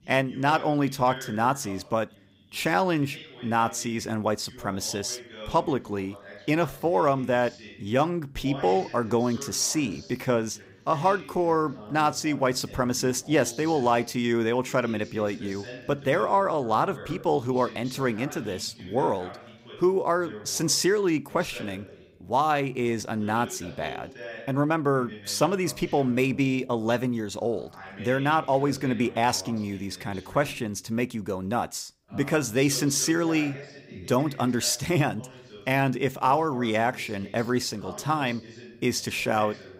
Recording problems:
voice in the background; noticeable; throughout; 15 dB below the speech

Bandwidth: 15.5 kHz